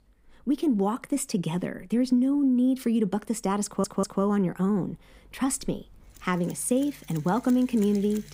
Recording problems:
machinery noise; faint; throughout; 25 dB below the speech
audio stuttering; at 3.5 s

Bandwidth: 15.5 kHz